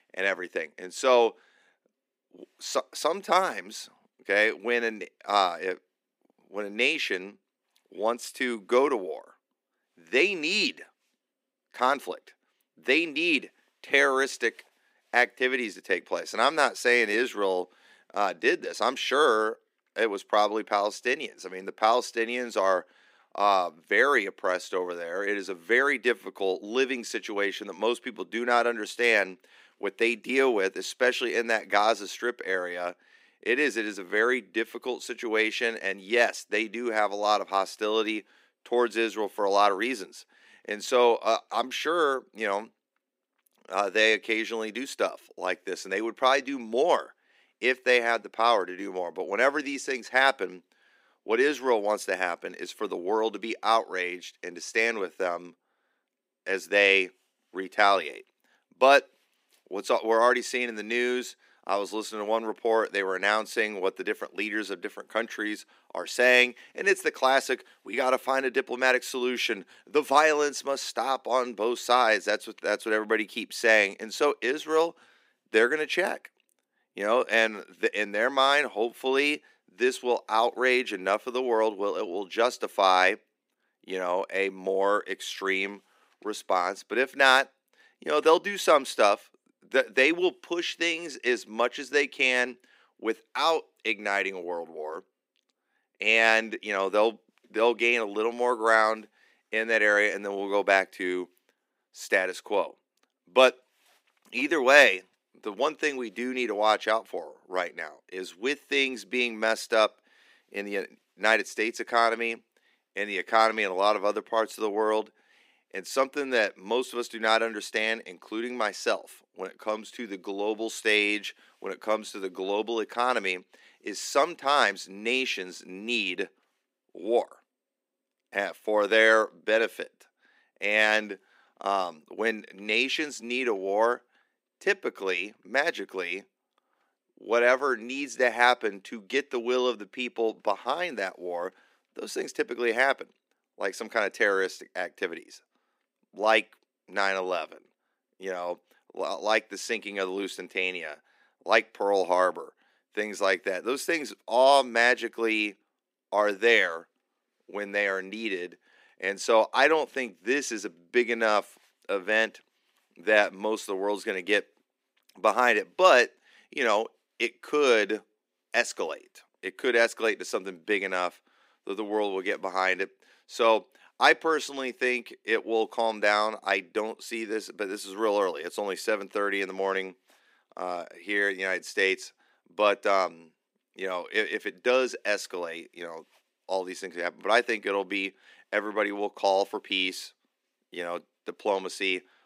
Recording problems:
thin; somewhat; fading below 250 Hz

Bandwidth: 15.5 kHz